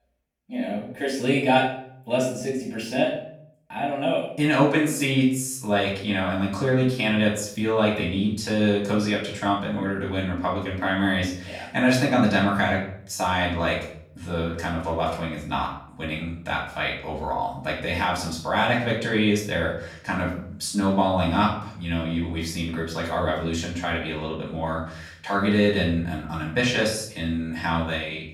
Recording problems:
off-mic speech; far
room echo; noticeable; dies away in 0.5 s

